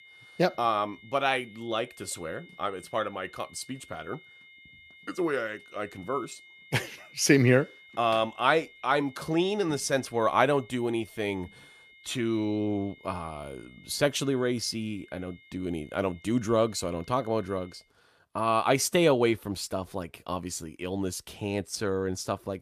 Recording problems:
high-pitched whine; faint; until 18 s; 2 kHz, 25 dB below the speech

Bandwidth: 14.5 kHz